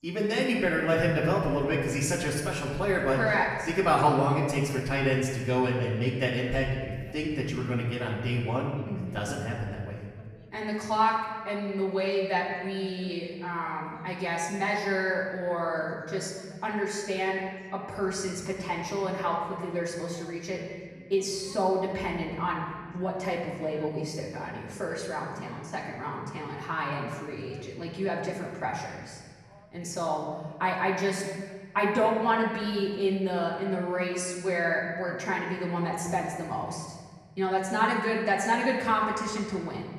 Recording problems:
off-mic speech; far
room echo; noticeable; dies away in 1.5 s
background chatter; faint; throughout; 2 voices, 25 dB below the speech

